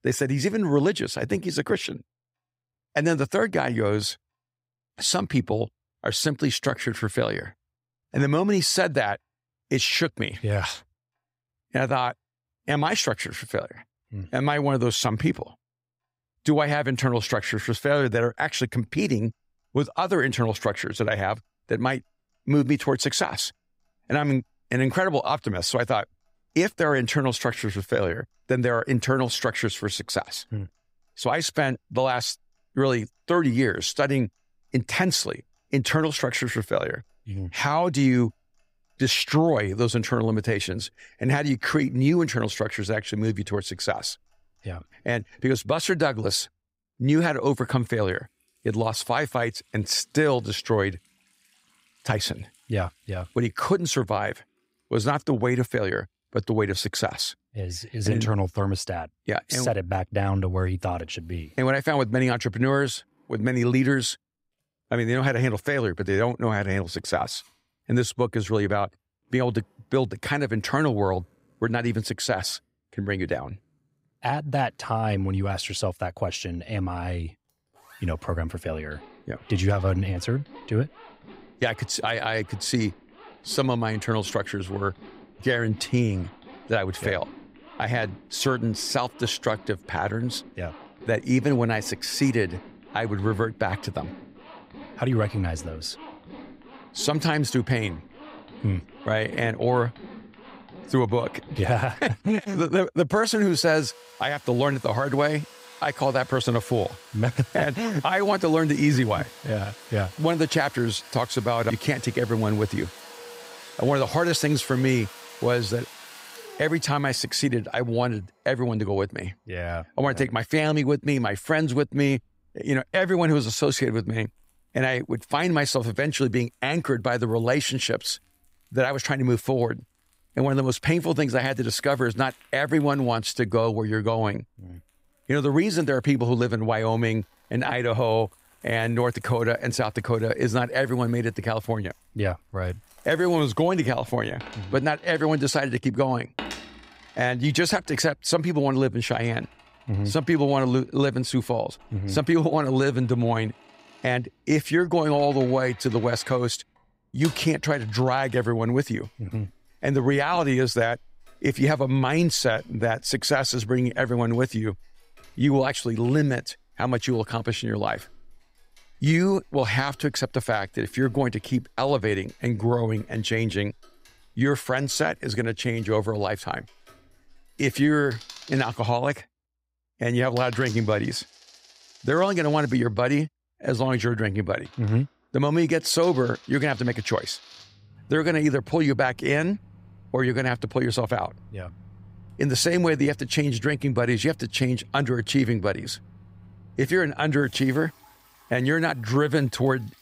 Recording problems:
household noises; faint; throughout; 20 dB below the speech

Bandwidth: 15.5 kHz